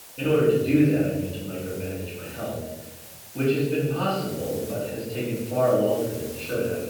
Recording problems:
off-mic speech; far
room echo; noticeable; dies away in 1.1 s
muffled; slightly; fading above 4 kHz
hiss; noticeable; throughout; 15 dB below the speech

